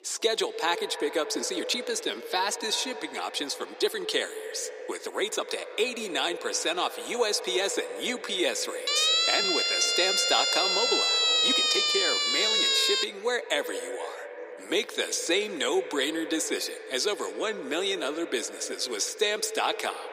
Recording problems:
echo of what is said; strong; throughout; 80 ms later, 10 dB below the speech
thin; very; fading below 300 Hz
background chatter; faint; throughout; 4 voices, 25 dB below the speech
uneven, jittery; strongly; from 1.5 to 16 s
siren; loud; from 9 to 13 s; peak 9 dB above the speech

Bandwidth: 15.5 kHz